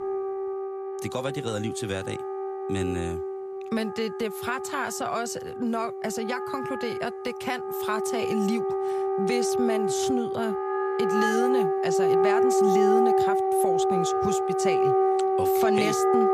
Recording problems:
background music; very loud; throughout; 5 dB above the speech

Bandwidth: 14.5 kHz